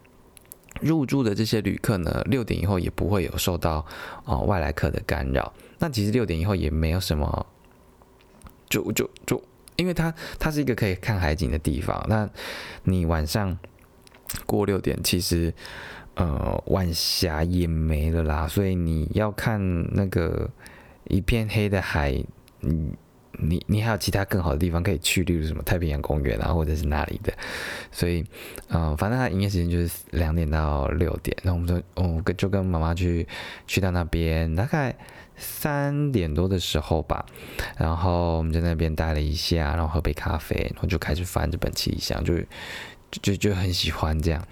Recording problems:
squashed, flat; somewhat

